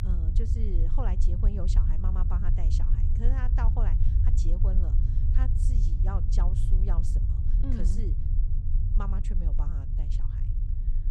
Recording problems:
low rumble; loud; throughout; 2 dB below the speech

